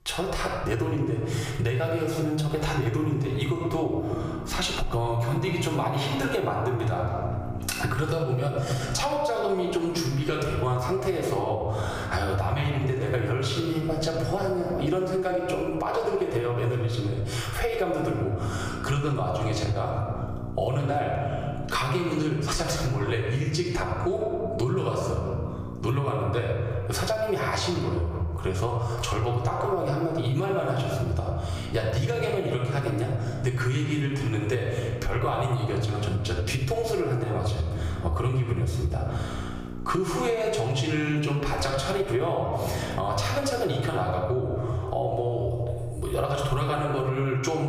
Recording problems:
off-mic speech; far
room echo; noticeable; dies away in 1.1 s
squashed, flat; somewhat
electrical hum; faint; from 4 to 15 s, from 18 to 26 s and from 32 to 44 s; 60 Hz, 20 dB below the speech
abrupt cut into speech; at the end

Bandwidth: 15 kHz